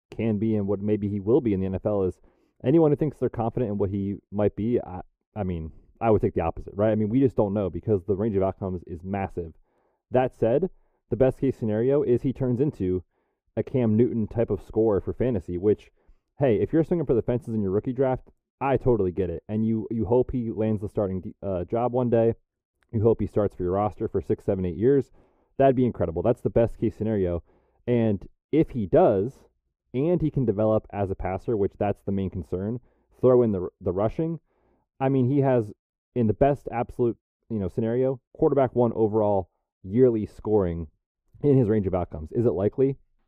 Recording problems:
muffled; very; fading above 1.5 kHz

